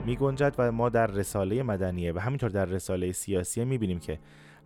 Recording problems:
background music; faint; throughout; 20 dB below the speech

